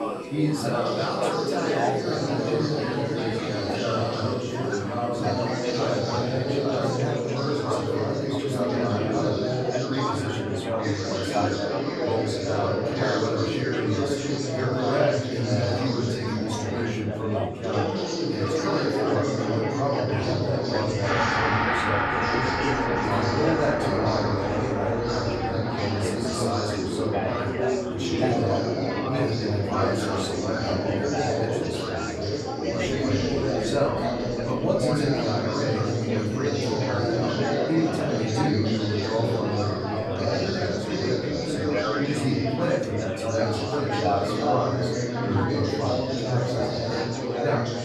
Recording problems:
off-mic speech; far
room echo; noticeable; dies away in 0.6 s
chatter from many people; very loud; throughout; 3 dB above the speech
background music; loud; throughout; 3 dB below the speech

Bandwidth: 14.5 kHz